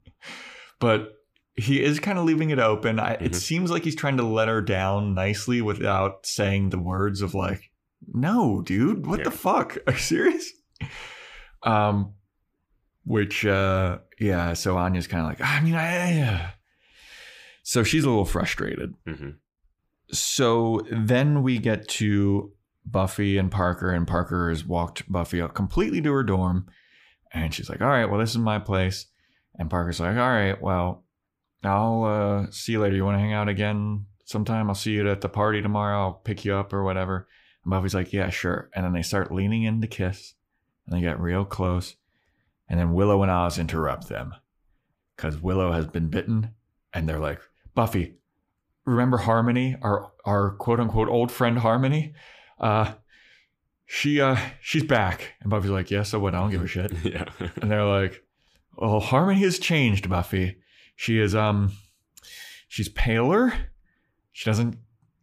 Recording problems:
none

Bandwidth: 15 kHz